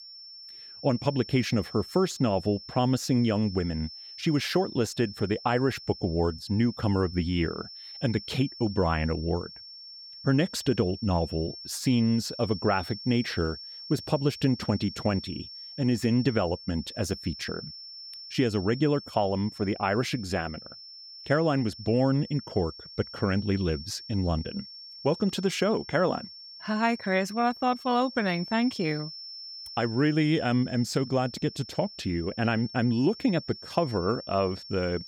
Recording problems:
high-pitched whine; noticeable; throughout; 5.5 kHz, 15 dB below the speech

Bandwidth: 17 kHz